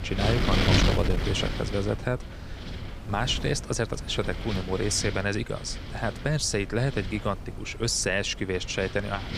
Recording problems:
wind noise on the microphone; heavy; 4 dB below the speech

